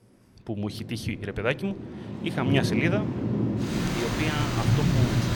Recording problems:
rain or running water; very loud; throughout; 4 dB above the speech

